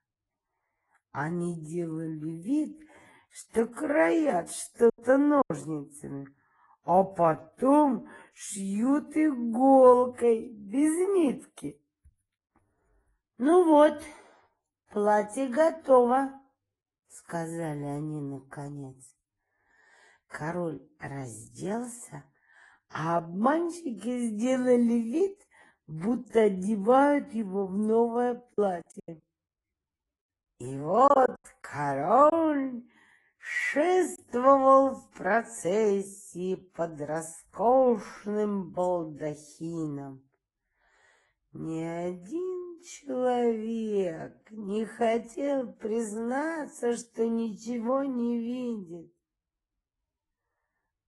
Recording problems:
wrong speed, natural pitch; too slow; 0.7 times normal speed
garbled, watery; slightly; nothing above 11 kHz
choppy; very; at 5 s, from 29 to 32 s and at 34 s; 10% of the speech affected

